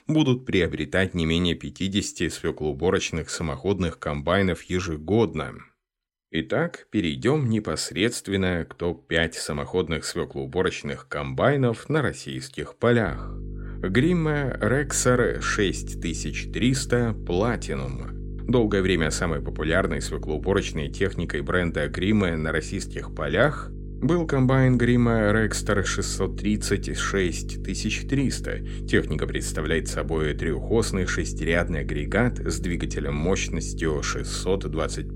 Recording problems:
electrical hum; noticeable; from 13 s on; 50 Hz, 20 dB below the speech

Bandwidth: 16 kHz